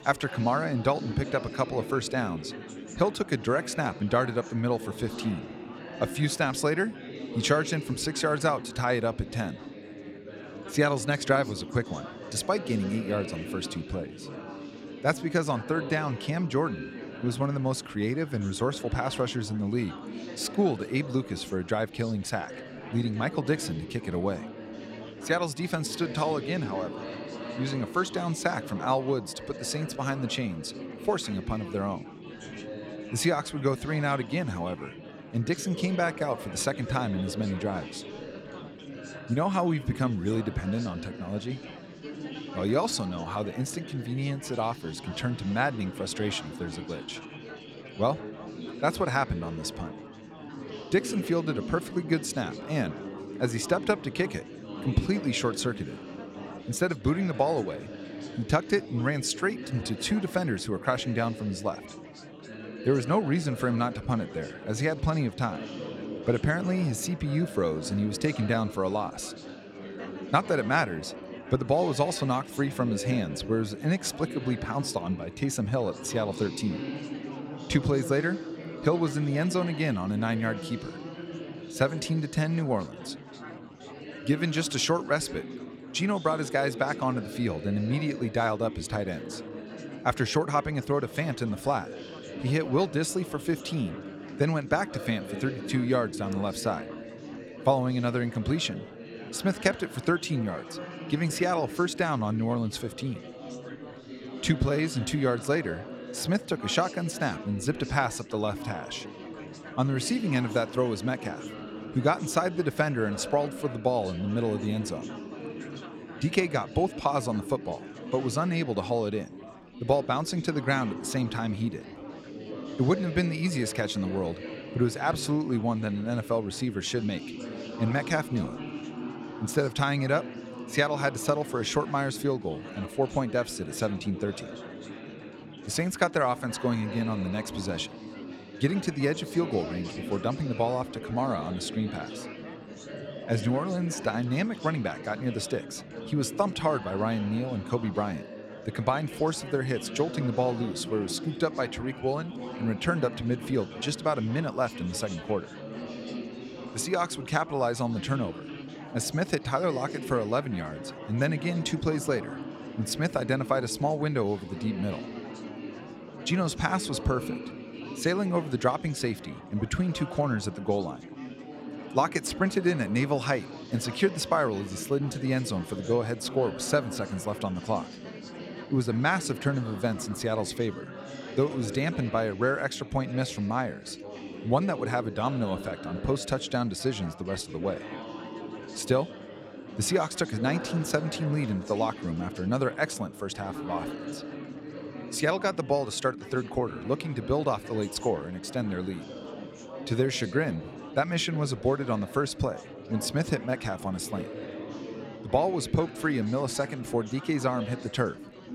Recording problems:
chatter from many people; noticeable; throughout; 10 dB below the speech

